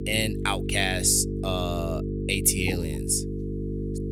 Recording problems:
electrical hum; loud; throughout; 50 Hz, 10 dB below the speech

